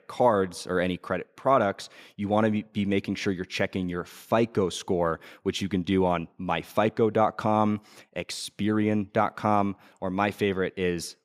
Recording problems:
none

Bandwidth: 15 kHz